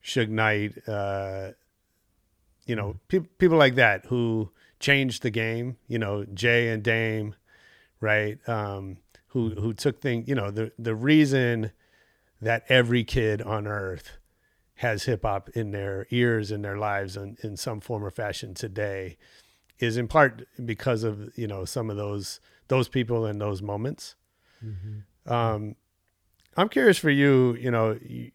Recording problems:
none

